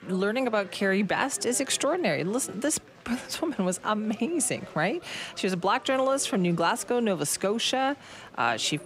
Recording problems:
murmuring crowd; faint; throughout; 20 dB below the speech

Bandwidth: 15.5 kHz